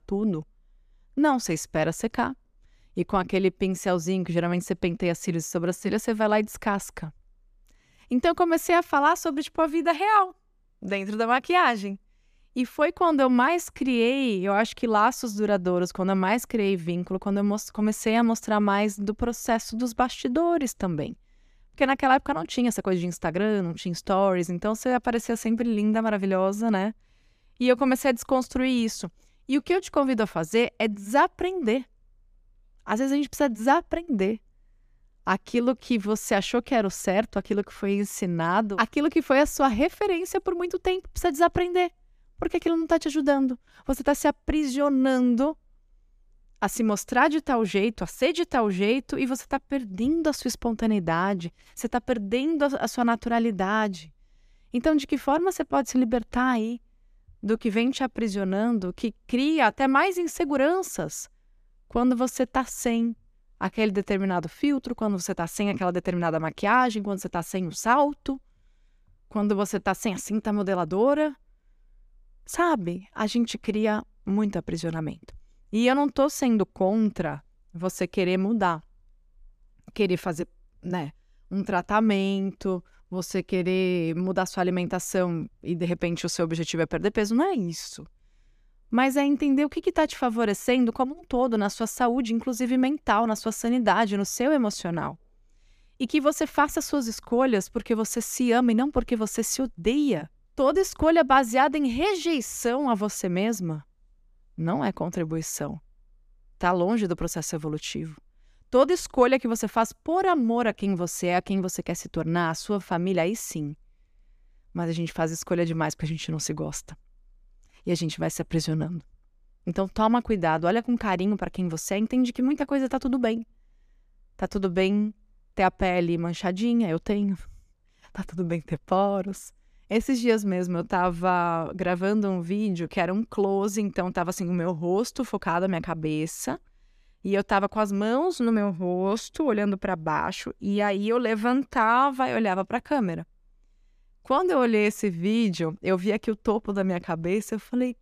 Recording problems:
none

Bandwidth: 14.5 kHz